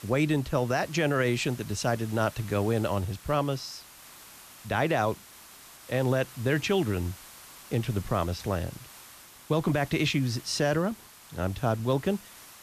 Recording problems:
hiss; noticeable; throughout; 20 dB below the speech

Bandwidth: 14.5 kHz